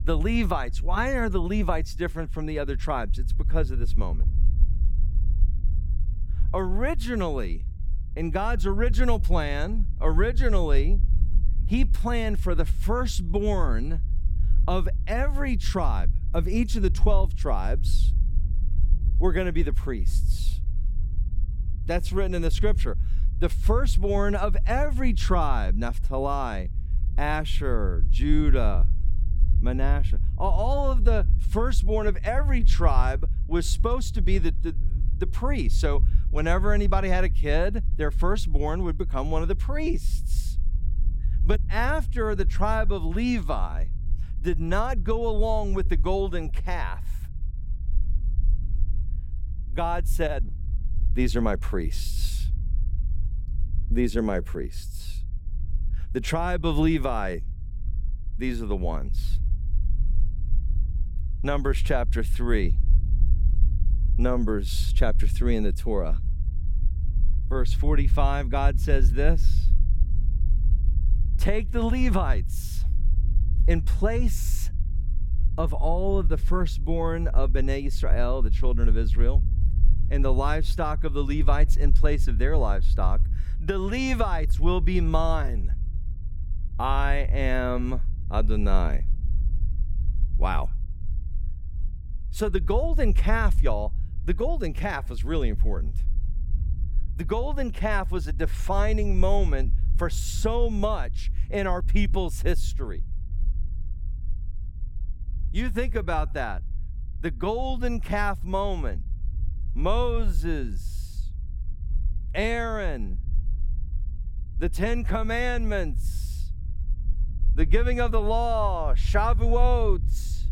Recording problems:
low rumble; noticeable; throughout; 20 dB below the speech

